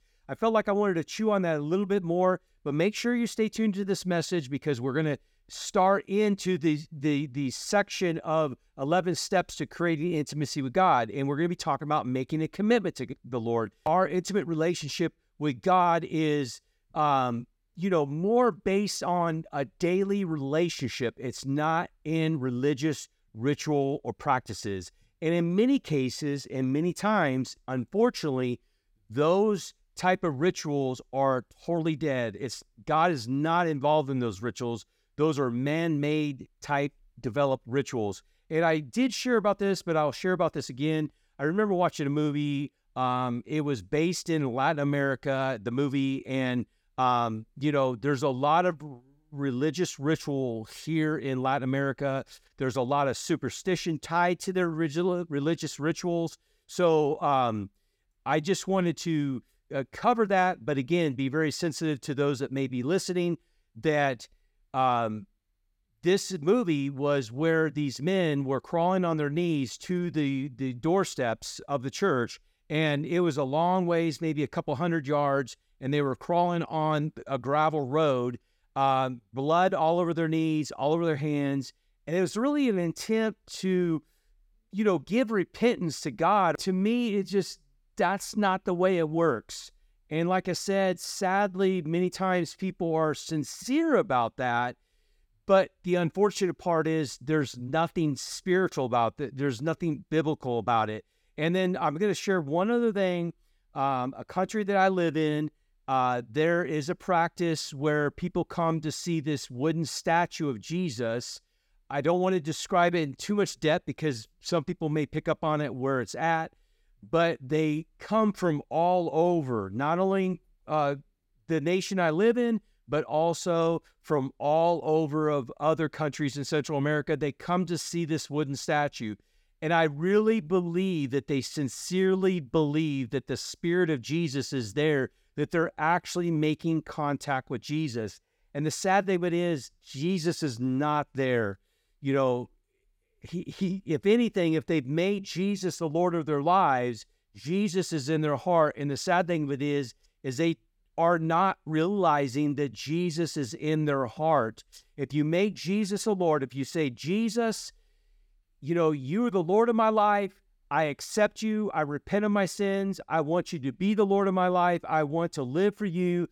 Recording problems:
none

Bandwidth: 18 kHz